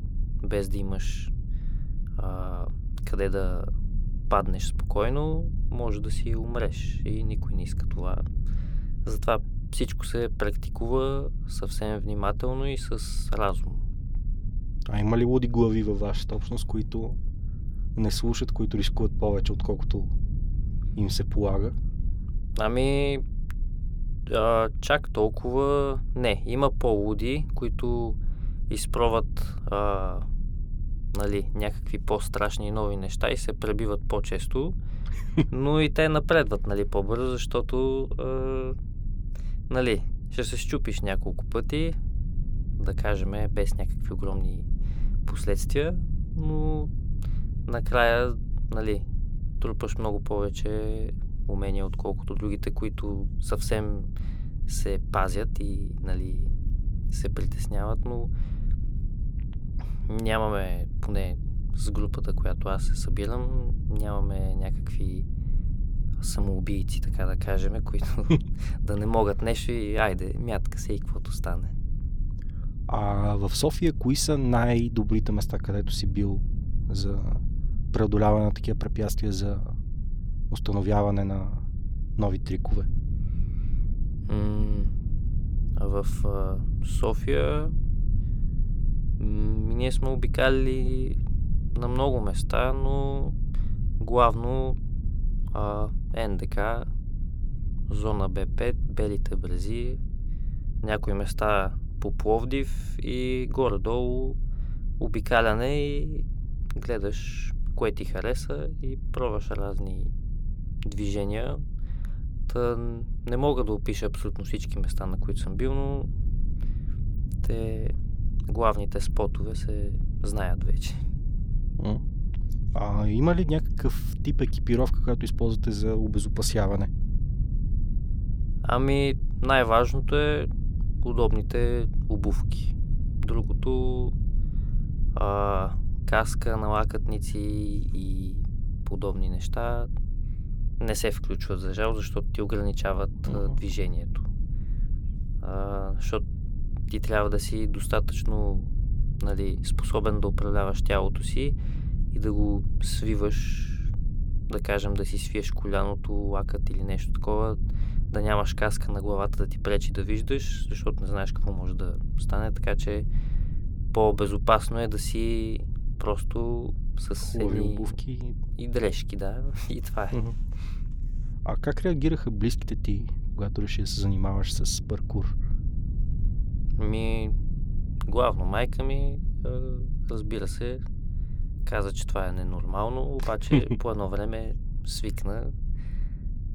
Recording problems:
low rumble; noticeable; throughout; 20 dB below the speech

